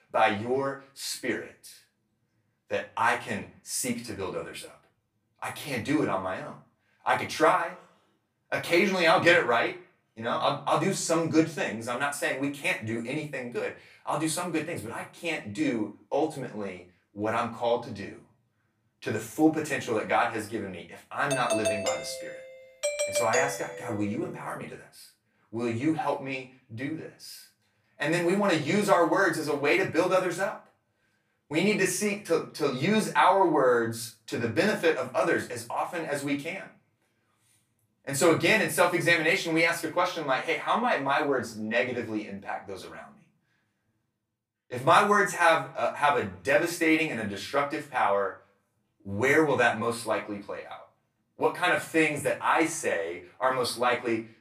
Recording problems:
off-mic speech; far
room echo; slight; dies away in 0.3 s
doorbell; noticeable; from 21 to 24 s; peak 1 dB below the speech

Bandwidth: 15 kHz